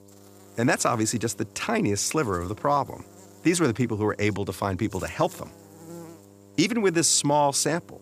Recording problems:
electrical hum; faint; throughout; 50 Hz, 25 dB below the speech

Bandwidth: 15 kHz